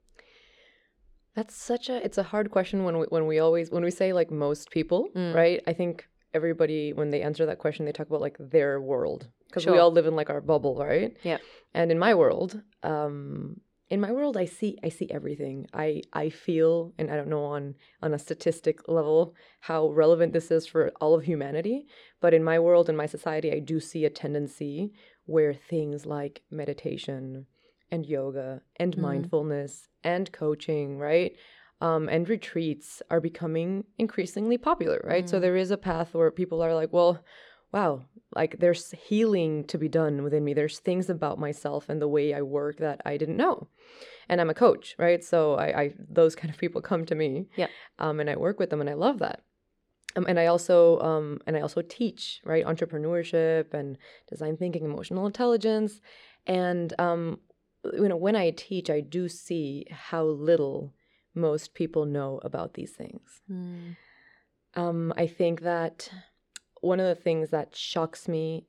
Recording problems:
muffled; slightly; fading above 2 kHz

